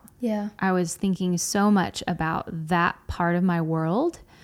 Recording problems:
none

